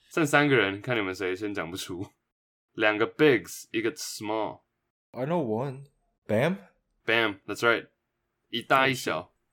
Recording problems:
none

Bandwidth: 17.5 kHz